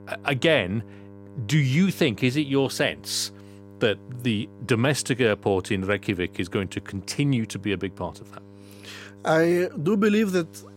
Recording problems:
electrical hum; faint; throughout; 50 Hz, 25 dB below the speech

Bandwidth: 16 kHz